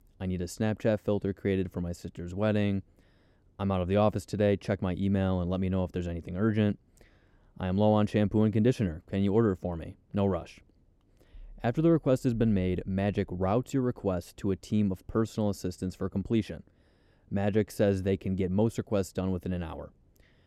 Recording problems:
none

